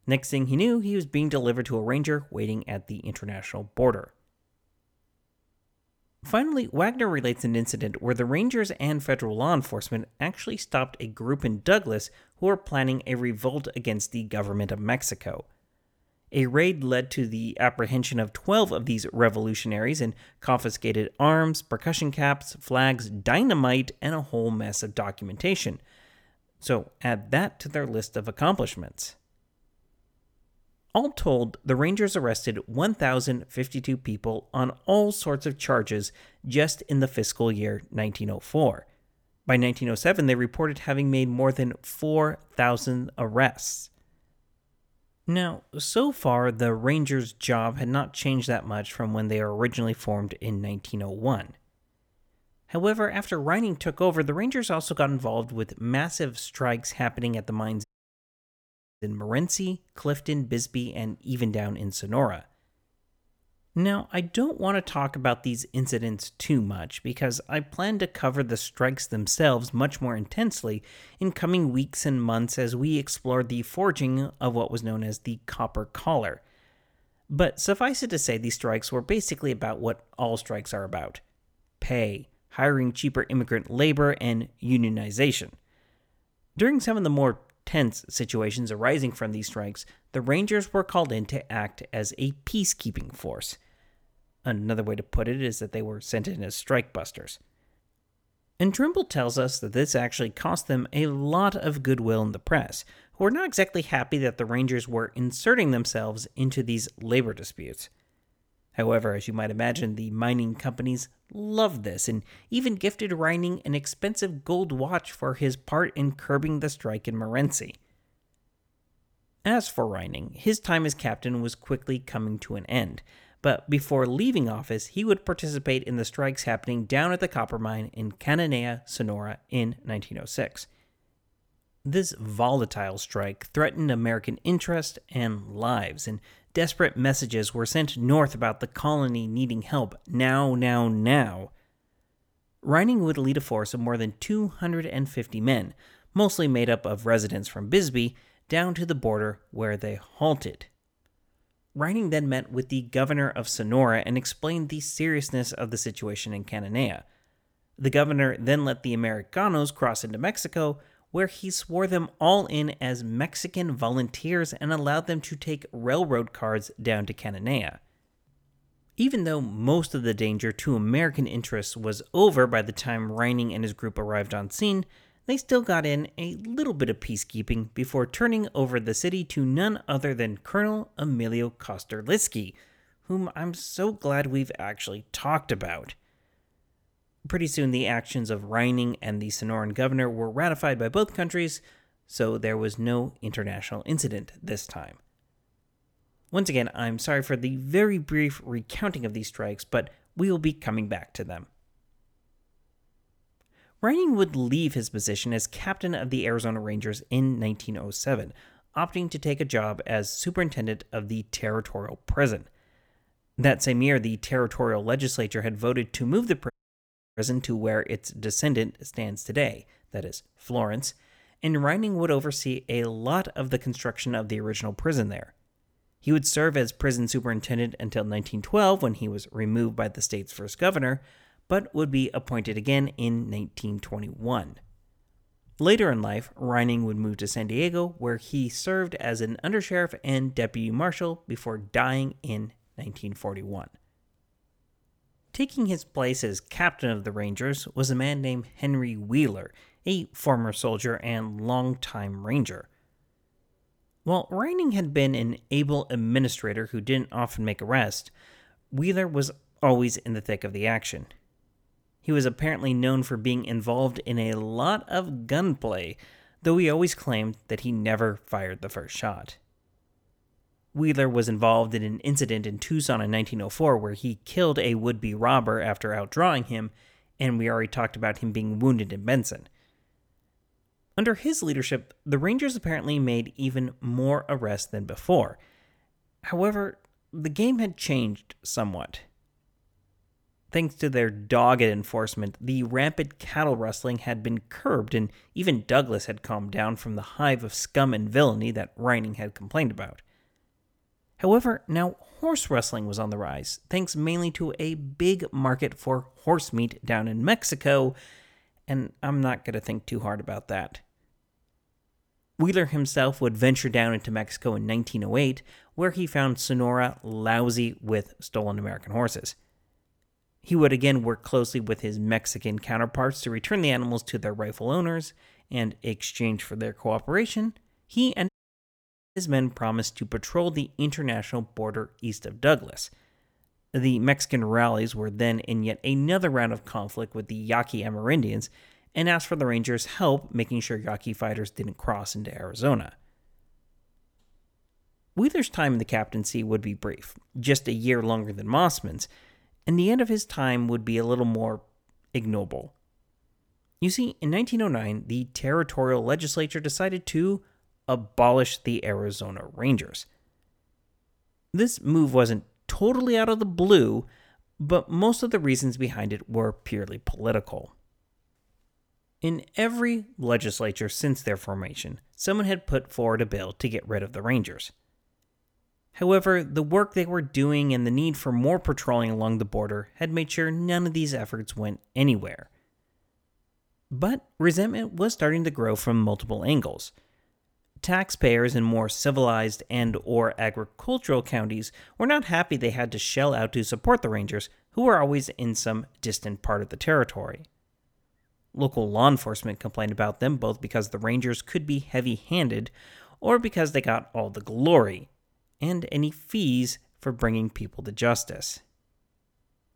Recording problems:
audio cutting out; at 58 s for 1 s, at 3:37 for 0.5 s and at 5:28 for 1 s

